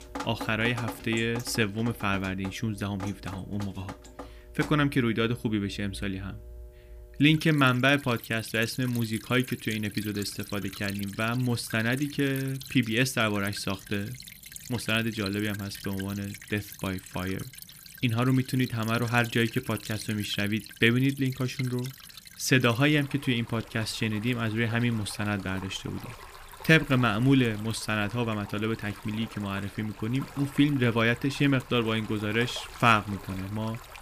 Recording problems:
rain or running water; noticeable; throughout; 15 dB below the speech

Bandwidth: 15 kHz